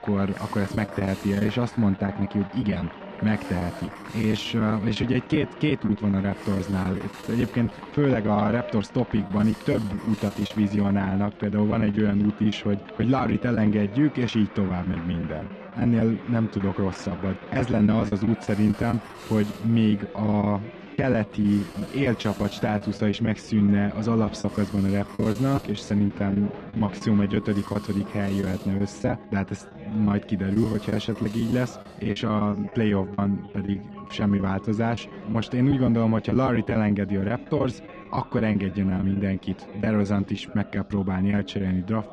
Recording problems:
muffled; slightly; fading above 4 kHz
chatter from many people; noticeable; throughout; 15 dB below the speech
background music; faint; throughout; 25 dB below the speech
hiss; faint; until 12 s and from 17 to 33 s; 20 dB below the speech
choppy; very; 11% of the speech affected

